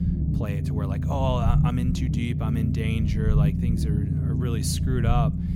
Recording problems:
low rumble; loud; throughout; 3 dB below the speech

